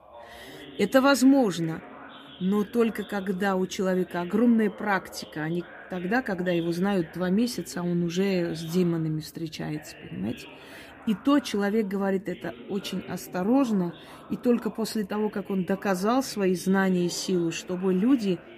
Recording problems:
voice in the background; noticeable; throughout; 20 dB below the speech

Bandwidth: 15 kHz